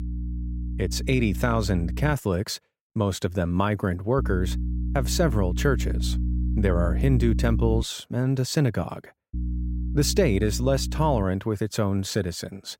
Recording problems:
electrical hum; noticeable; until 2 s, from 4 to 8 s and from 9.5 to 11 s; 60 Hz, 15 dB below the speech

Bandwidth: 16 kHz